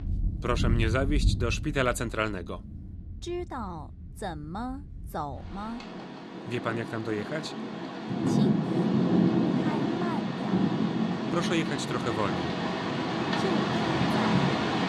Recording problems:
rain or running water; very loud; throughout; 5 dB above the speech

